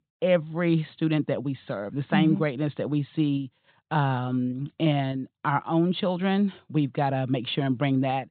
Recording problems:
high frequencies cut off; severe; nothing above 4 kHz

